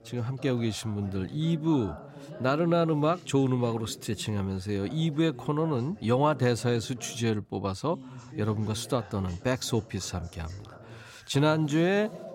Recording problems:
voice in the background; noticeable; throughout; 15 dB below the speech

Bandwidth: 16 kHz